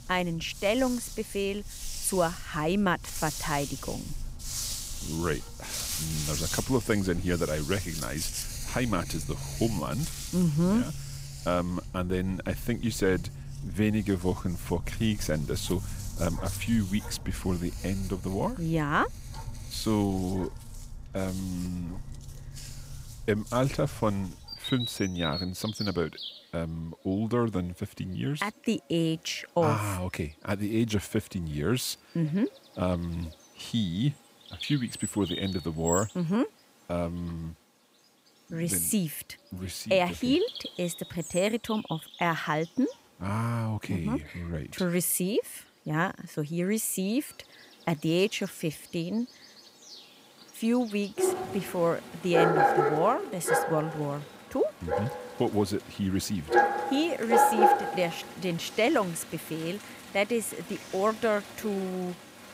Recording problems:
animal sounds; loud; throughout; 4 dB below the speech

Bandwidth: 15.5 kHz